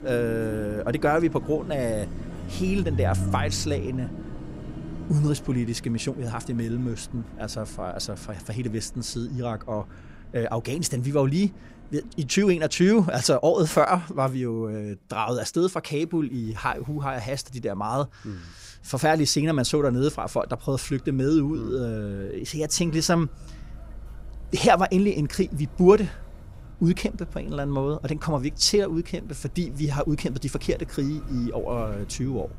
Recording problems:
traffic noise; noticeable; throughout; 15 dB below the speech

